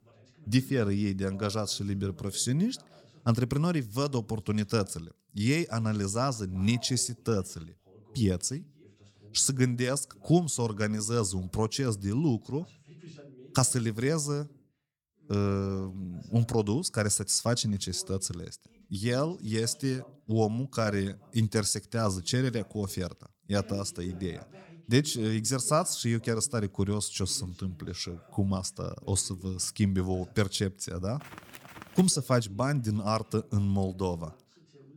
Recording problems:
voice in the background; faint; throughout; 25 dB below the speech

